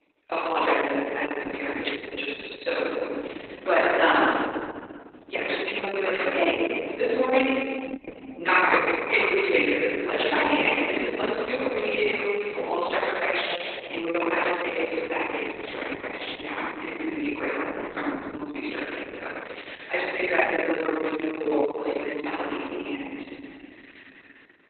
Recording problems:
room echo; strong; dies away in 2.2 s
off-mic speech; far
garbled, watery; badly; nothing above 4 kHz
thin; very slightly; fading below 300 Hz
jangling keys; faint; at 2 s; peak 10 dB below the speech

